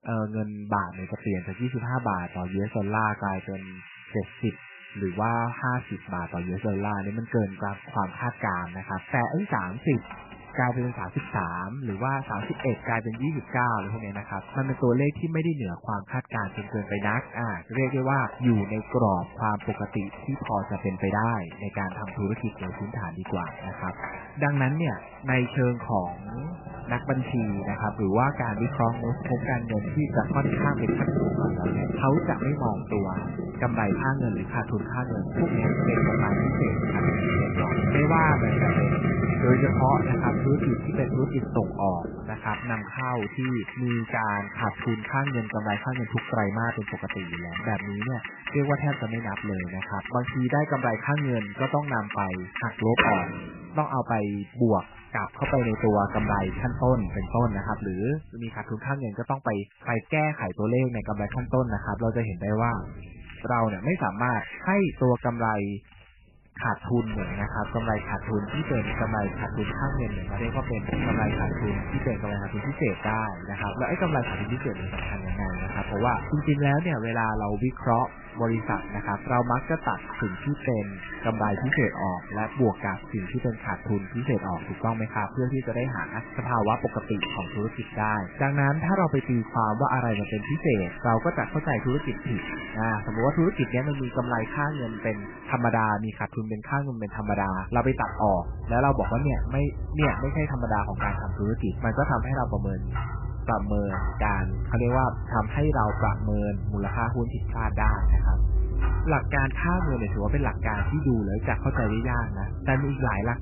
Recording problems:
garbled, watery; badly; nothing above 2.5 kHz
household noises; loud; throughout; 4 dB below the speech

